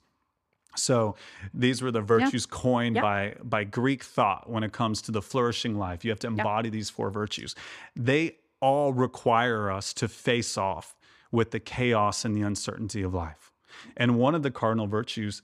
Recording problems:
none

